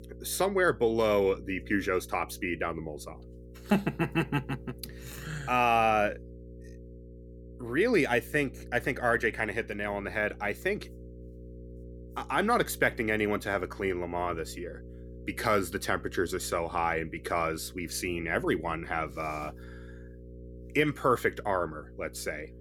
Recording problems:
electrical hum; faint; throughout; 60 Hz, 25 dB below the speech

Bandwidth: 18 kHz